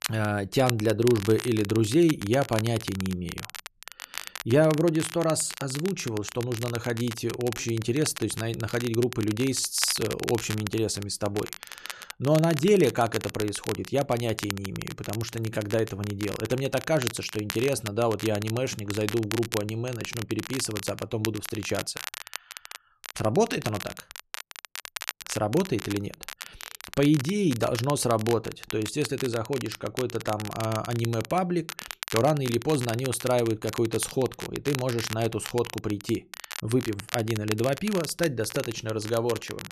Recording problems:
crackle, like an old record; noticeable; 10 dB below the speech

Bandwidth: 13.5 kHz